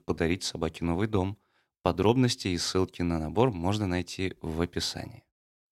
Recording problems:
none

